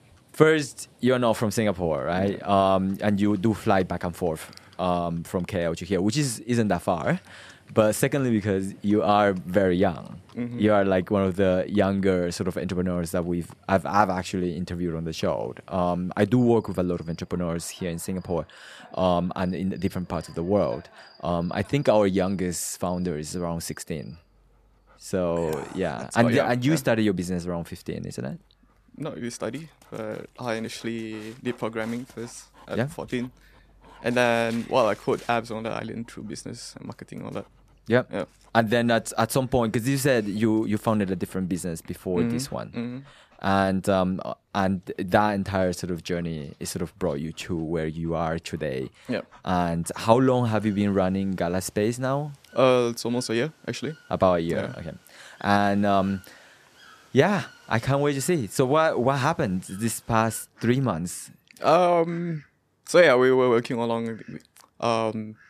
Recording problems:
animal sounds; faint; throughout; 30 dB below the speech

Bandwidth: 14.5 kHz